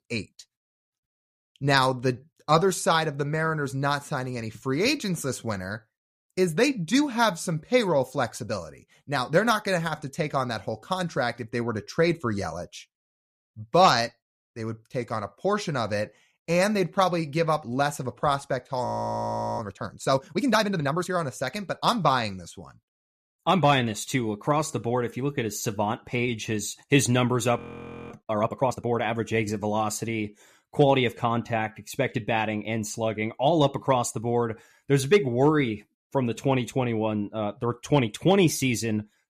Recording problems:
audio freezing; at 19 s for 0.5 s and at 28 s for 0.5 s

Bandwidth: 14.5 kHz